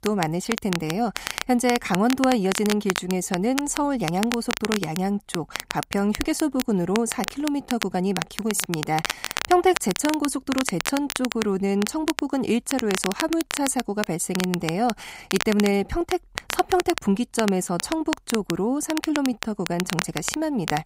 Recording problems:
crackle, like an old record; loud; 7 dB below the speech

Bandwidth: 15.5 kHz